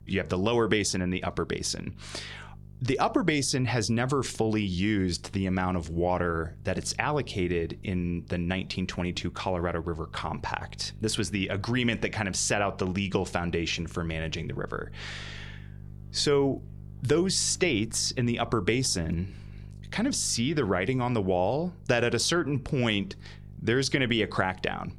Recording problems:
electrical hum; faint; throughout; 50 Hz, 30 dB below the speech

